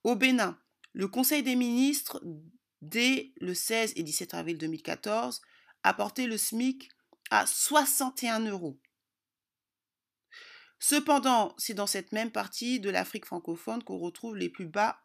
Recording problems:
none

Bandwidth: 14.5 kHz